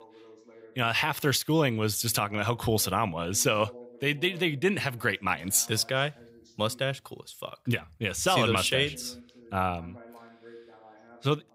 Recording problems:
voice in the background; faint; throughout; 25 dB below the speech

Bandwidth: 15.5 kHz